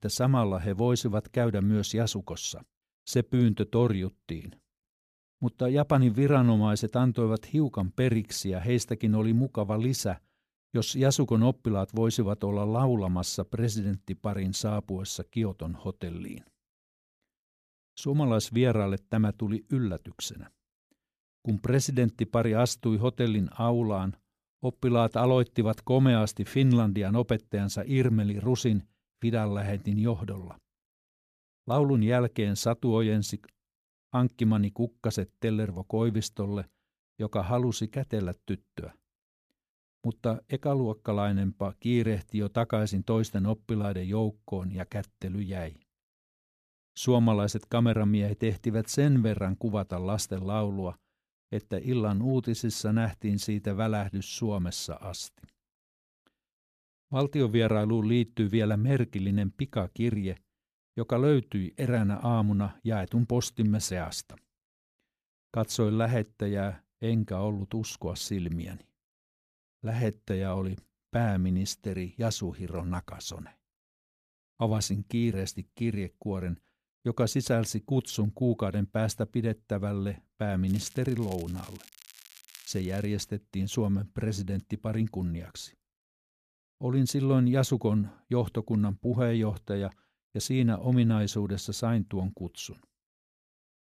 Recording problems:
crackling; faint; from 1:21 to 1:23; 20 dB below the speech

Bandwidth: 14.5 kHz